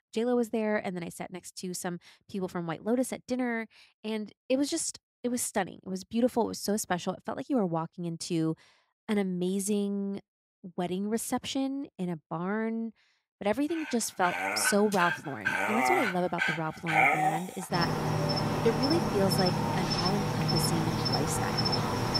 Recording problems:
animal sounds; very loud; from 14 s on; 3 dB above the speech

